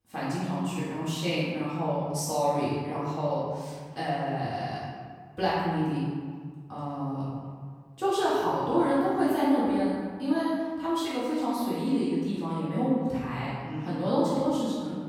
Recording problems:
room echo; strong; dies away in 1.5 s
off-mic speech; far

